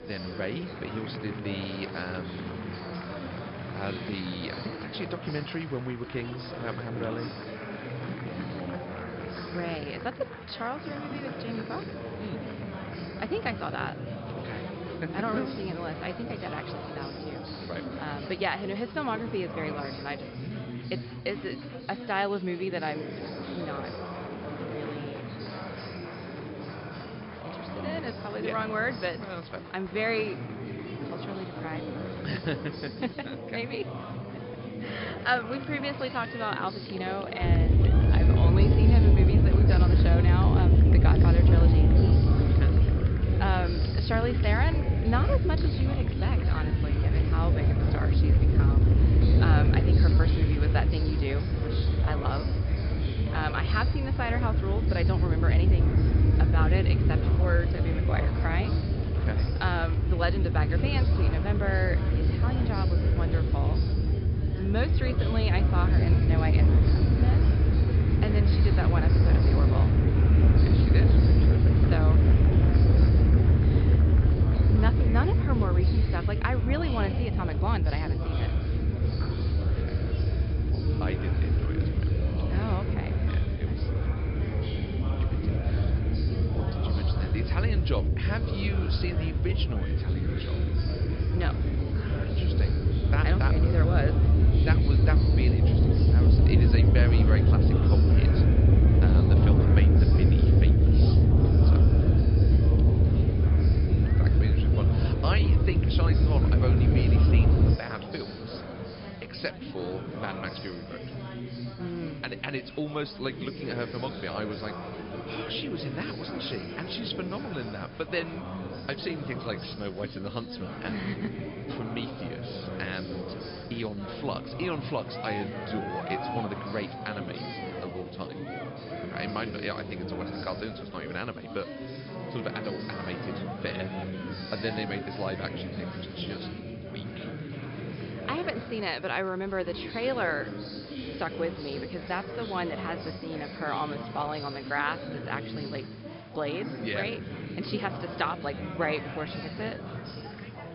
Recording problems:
high frequencies cut off; noticeable; nothing above 5.5 kHz
wind noise on the microphone; heavy; from 37 s to 1:48; 2 dB below the speech
chatter from many people; loud; throughout; 3 dB below the speech

